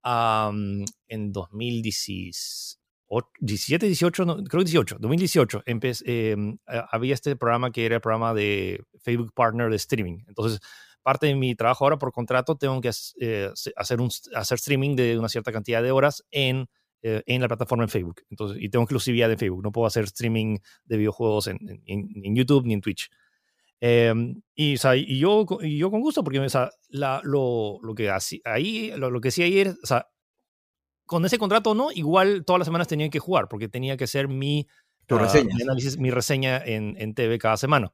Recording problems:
none

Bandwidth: 15 kHz